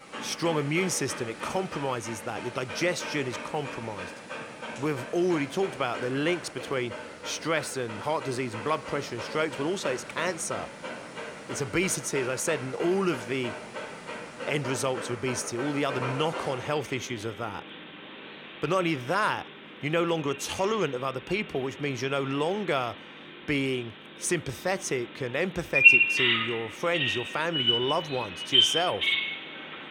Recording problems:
animal sounds; very loud; throughout; 1 dB above the speech

